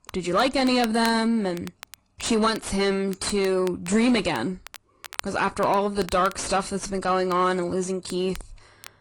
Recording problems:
distortion; slight; 9 dB below the speech
garbled, watery; slightly; nothing above 10 kHz
crackle, like an old record; noticeable; 20 dB below the speech

